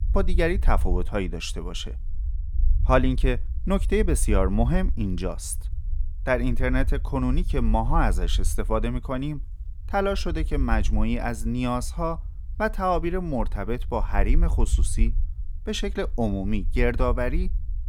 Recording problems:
low rumble; faint; throughout; 25 dB below the speech

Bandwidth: 18.5 kHz